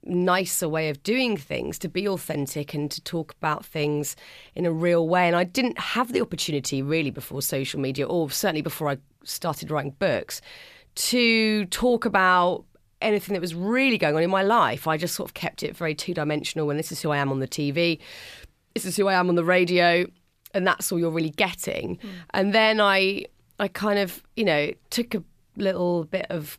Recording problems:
none

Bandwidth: 14.5 kHz